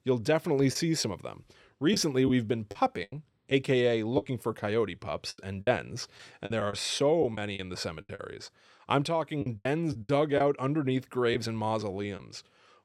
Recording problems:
choppy; very; 8% of the speech affected

